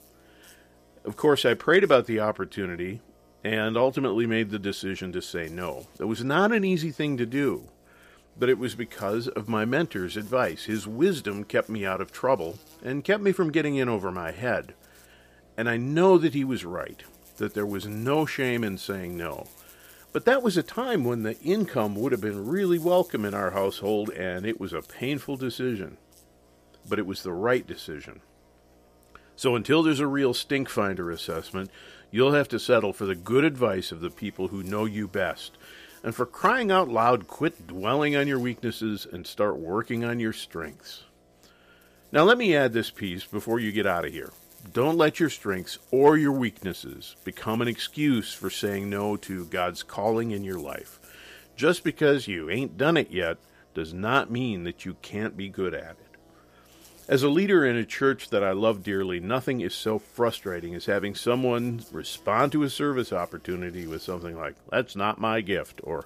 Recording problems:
electrical hum; faint; throughout; 60 Hz, 30 dB below the speech

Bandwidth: 15 kHz